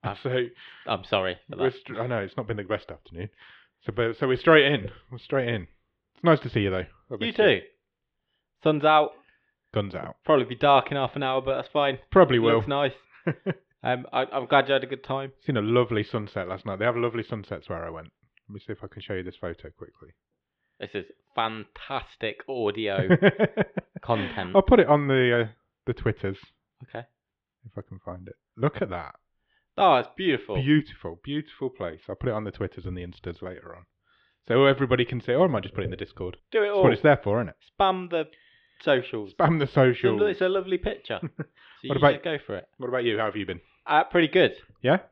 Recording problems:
muffled; very; fading above 3.5 kHz

